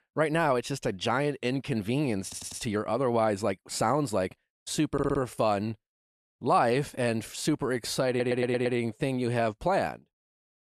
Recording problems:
audio stuttering; at 2 s, at 5 s and at 8 s

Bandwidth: 14 kHz